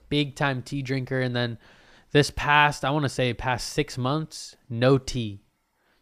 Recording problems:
none

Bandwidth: 15 kHz